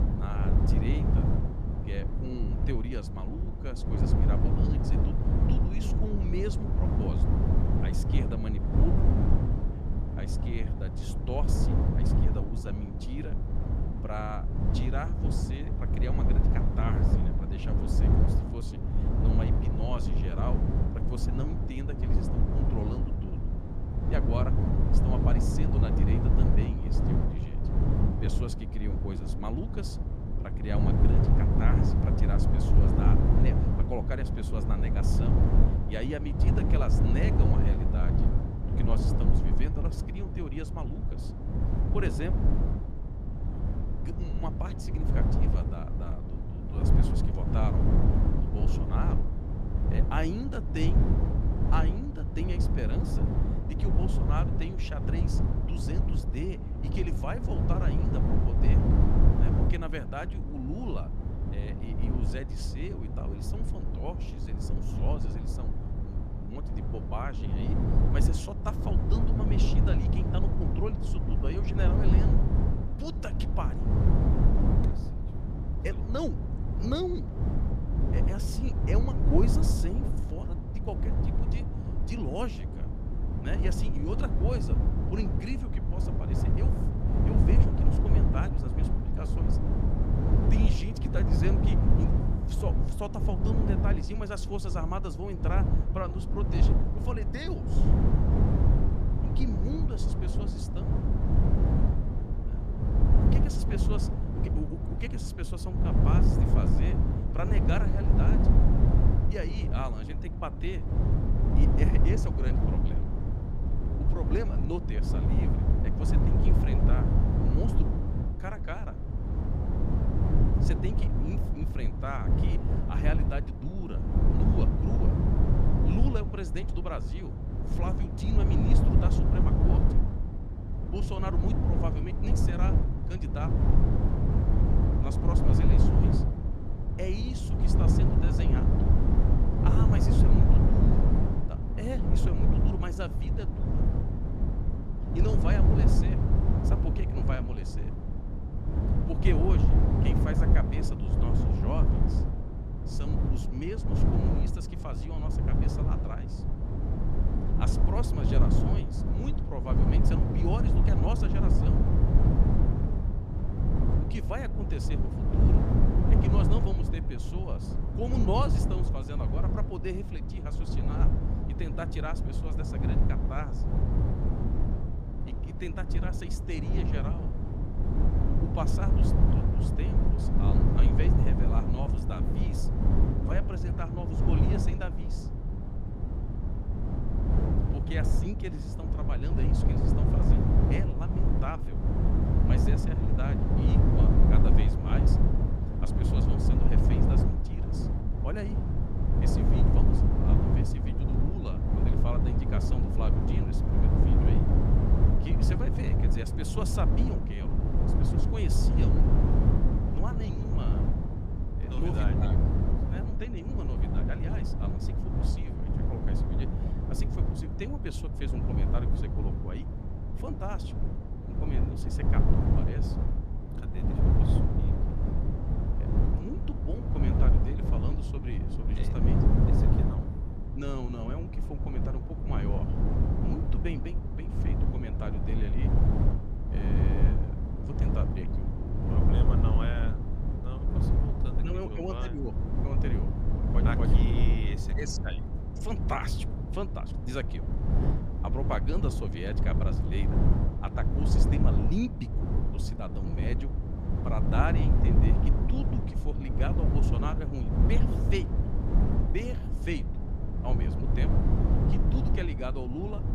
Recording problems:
wind noise on the microphone; heavy; 1 dB above the speech

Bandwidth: 15 kHz